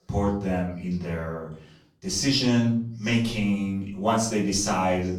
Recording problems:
off-mic speech; far
room echo; slight; dies away in 0.4 s

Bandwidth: 18 kHz